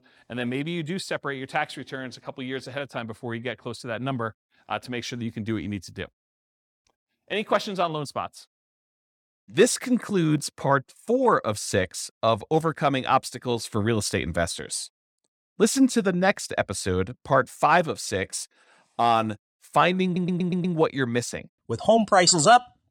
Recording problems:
audio stuttering; at 20 s

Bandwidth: 18.5 kHz